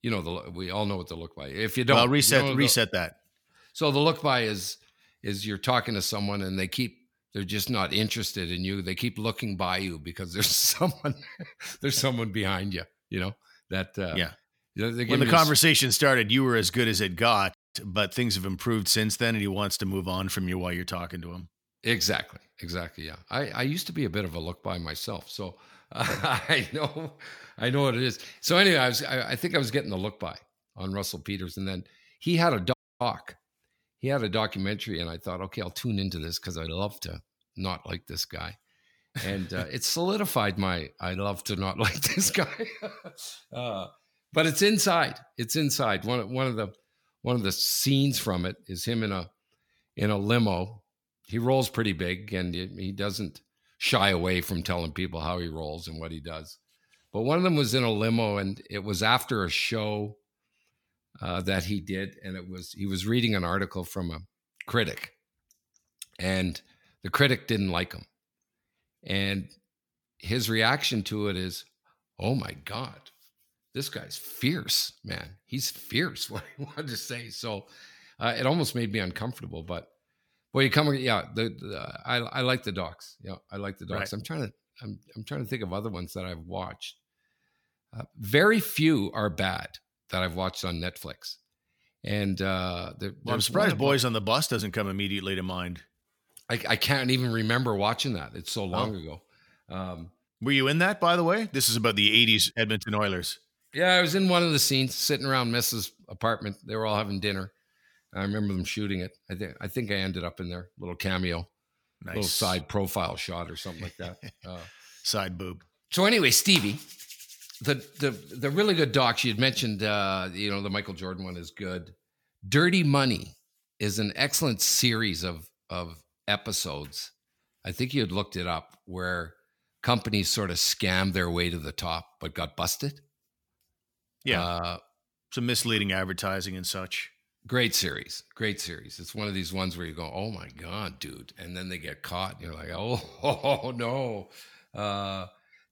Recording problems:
audio cutting out; at 18 s and at 33 s

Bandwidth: 18.5 kHz